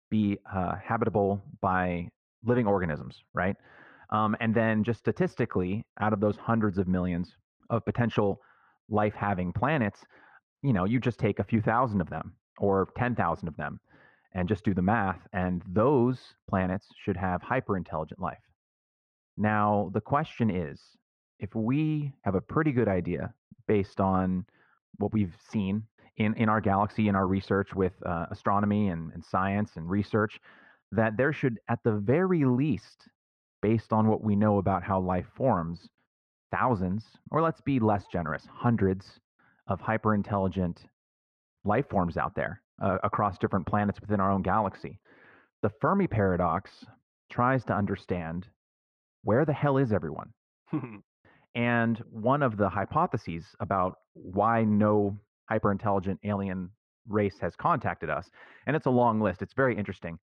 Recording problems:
muffled; very; fading above 1.5 kHz

